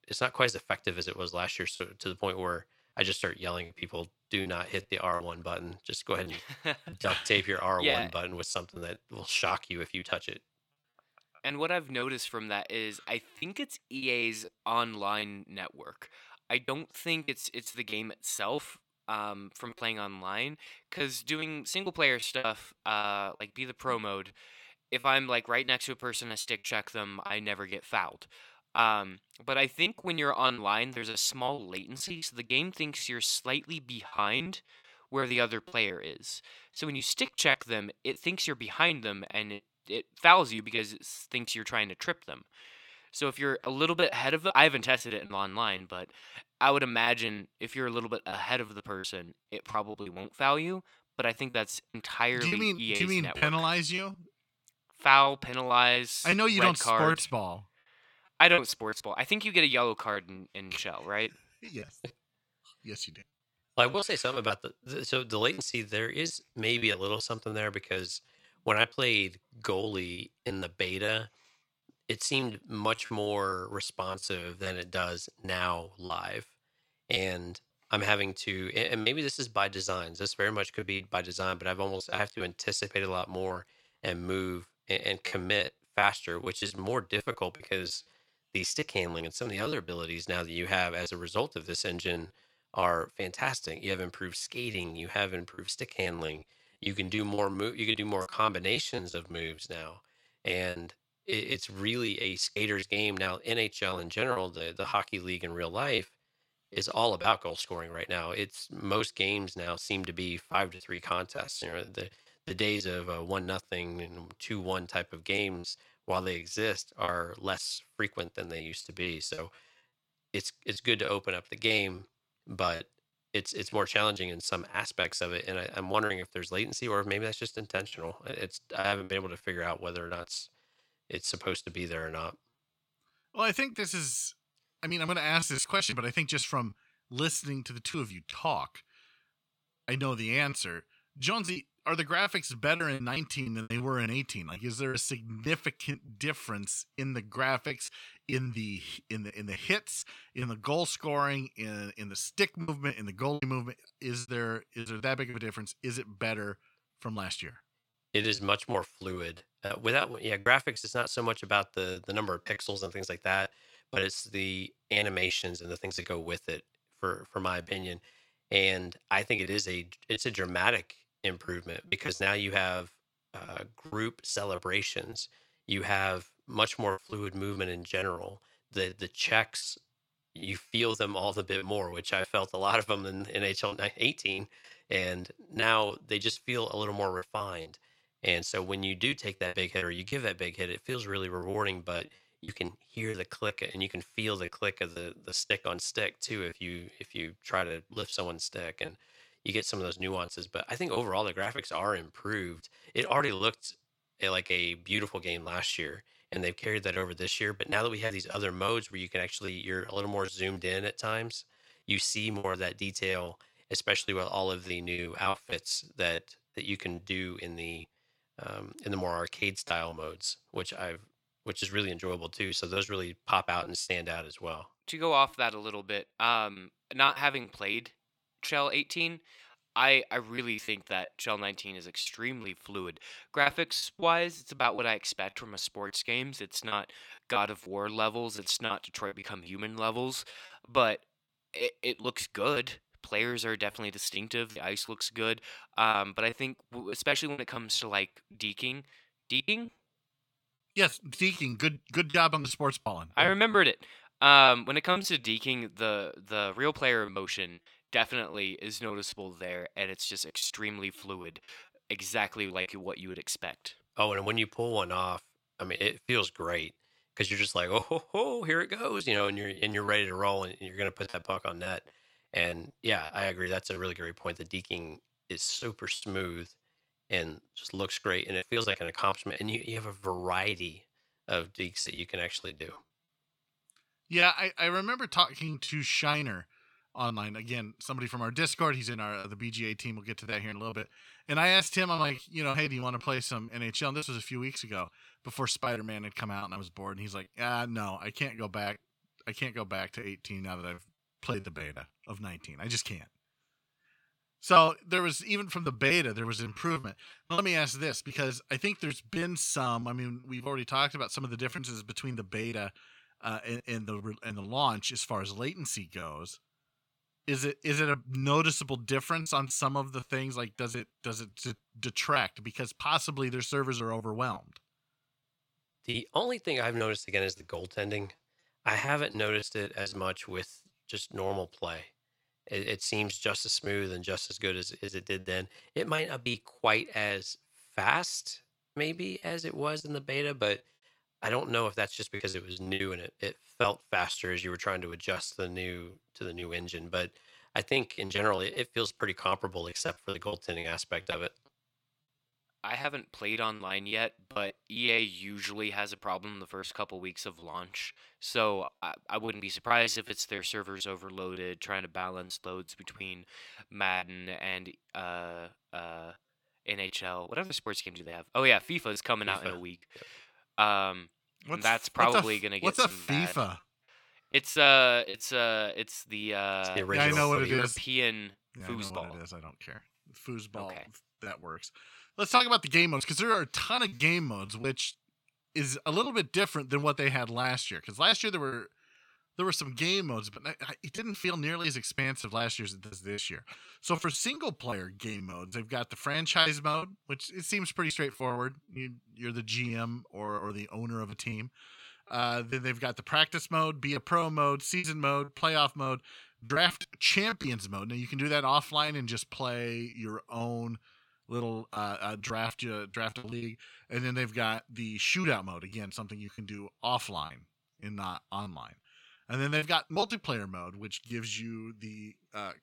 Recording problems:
thin; somewhat; fading below 300 Hz
choppy; very; 8% of the speech affected

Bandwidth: 17.5 kHz